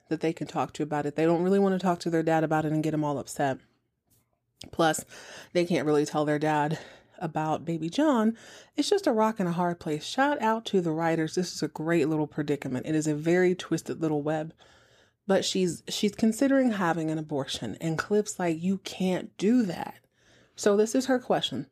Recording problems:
none

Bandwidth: 15 kHz